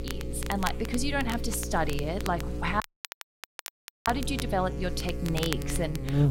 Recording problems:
electrical hum; noticeable; throughout; 60 Hz, 10 dB below the speech
crackle, like an old record; noticeable; 10 dB below the speech
audio cutting out; at 3 s for 1.5 s

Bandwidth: 16 kHz